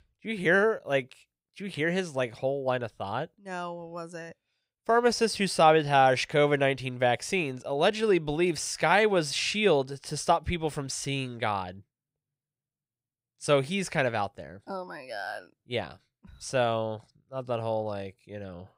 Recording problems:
none

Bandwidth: 15.5 kHz